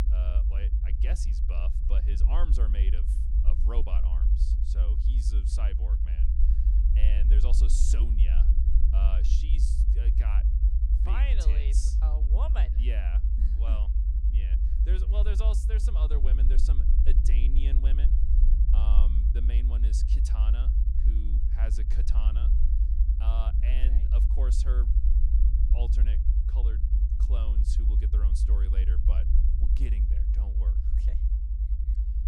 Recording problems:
low rumble; loud; throughout; 2 dB below the speech

